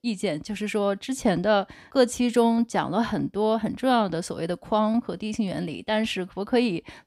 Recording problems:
none

